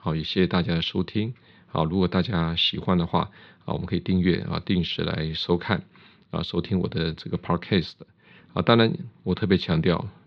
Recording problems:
muffled; very slightly; fading above 4 kHz

